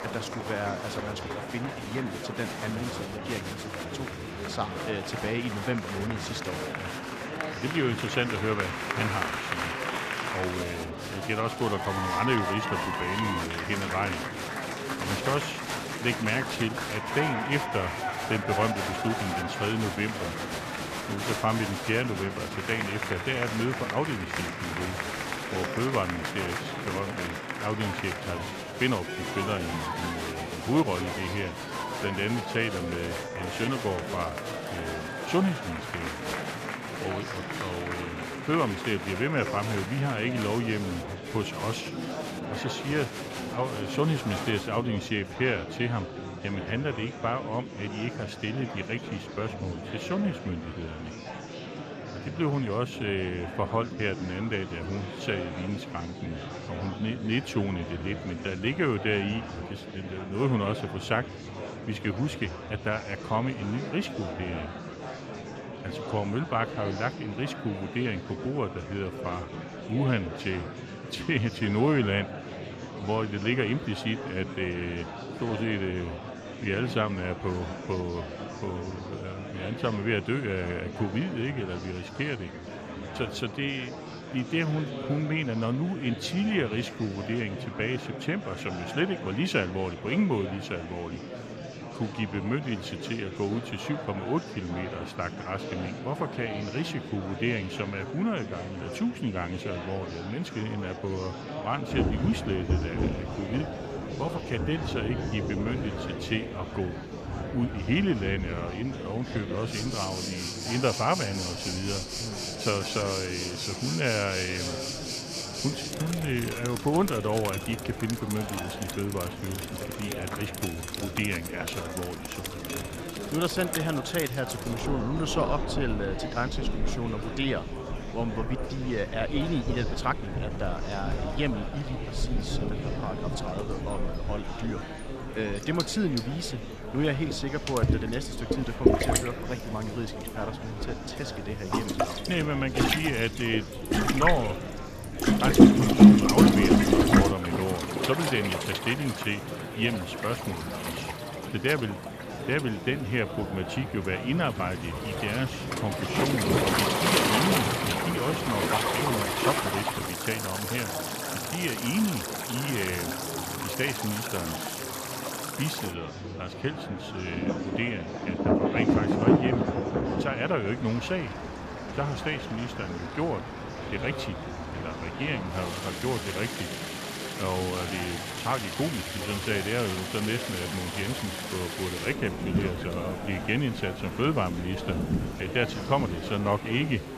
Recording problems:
rain or running water; very loud; from 1:42 on; 2 dB above the speech
murmuring crowd; loud; throughout; 5 dB below the speech

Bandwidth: 14.5 kHz